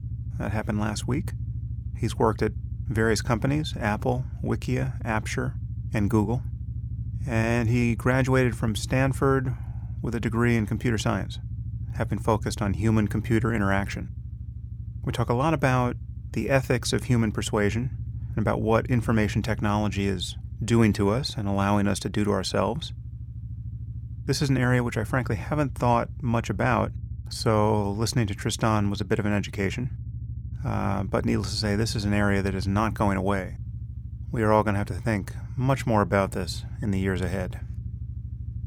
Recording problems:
low rumble; faint; throughout; 20 dB below the speech

